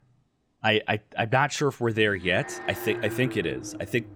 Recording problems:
alarms or sirens; noticeable; throughout; 10 dB below the speech

